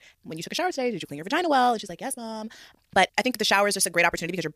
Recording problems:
wrong speed, natural pitch; too fast; 1.6 times normal speed

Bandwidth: 15 kHz